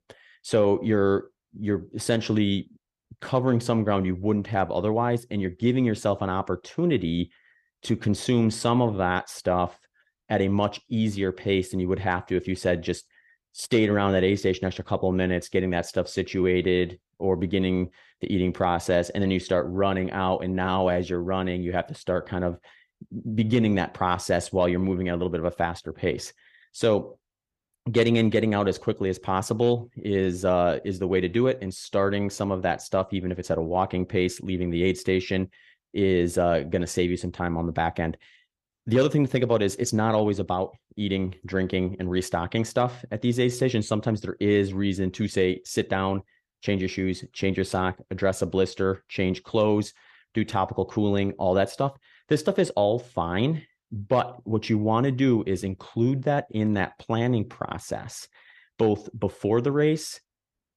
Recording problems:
none

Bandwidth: 15 kHz